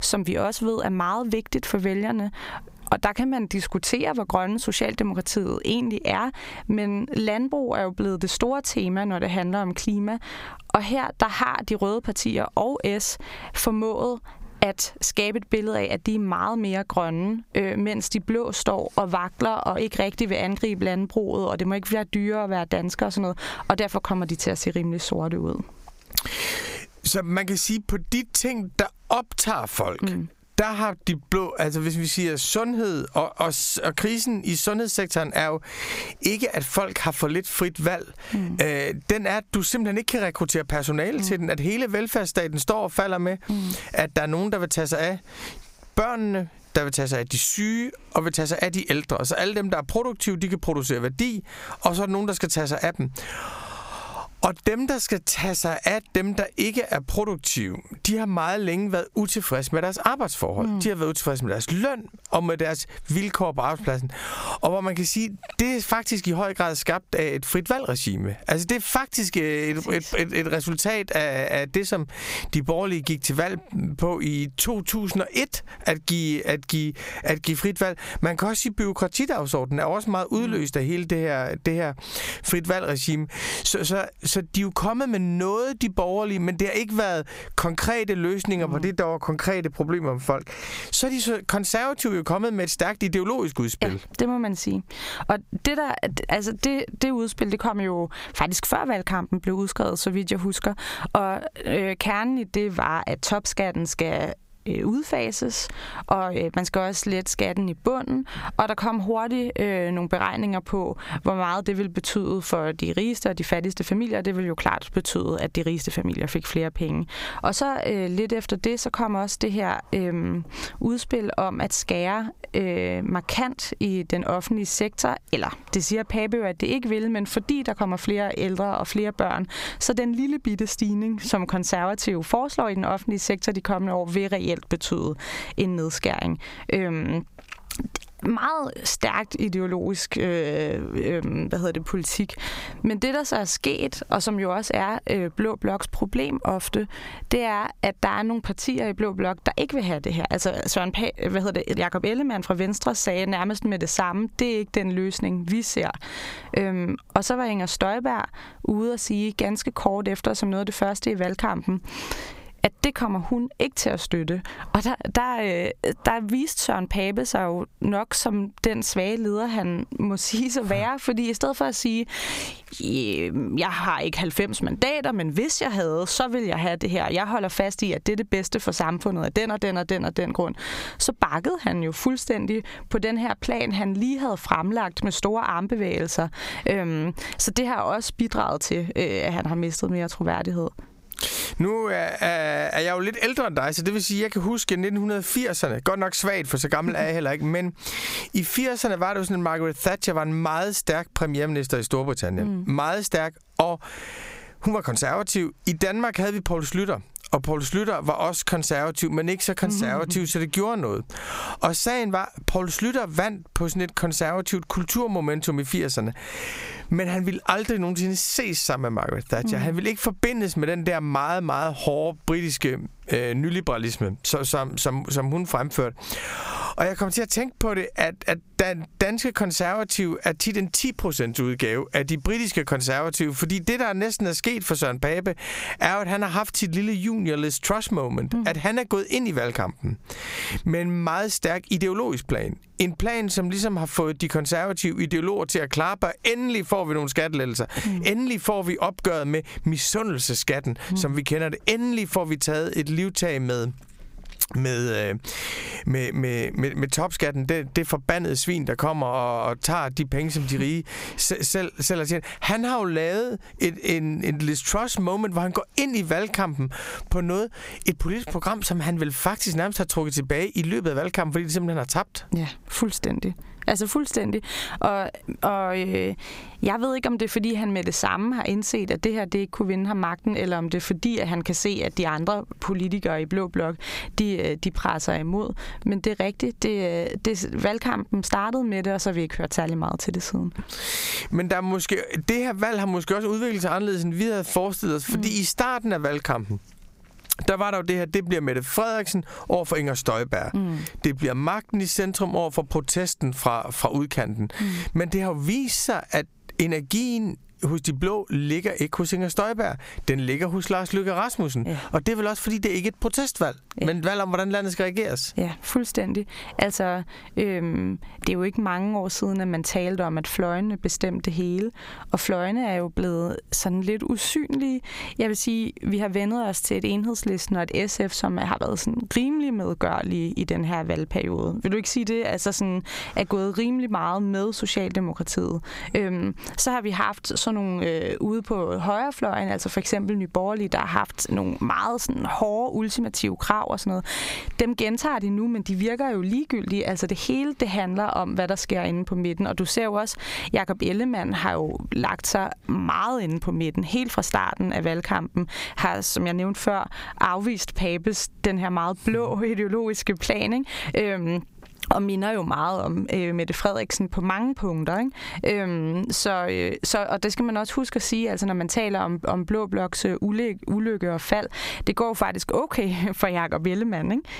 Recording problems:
squashed, flat; heavily

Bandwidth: 15.5 kHz